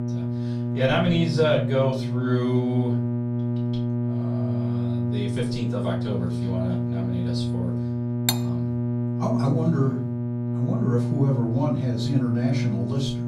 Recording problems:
off-mic speech; far
room echo; slight; dies away in 0.5 s
electrical hum; loud; throughout; 60 Hz, 5 dB below the speech
clattering dishes; noticeable; at 8.5 s; peak level with the speech

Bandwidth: 15.5 kHz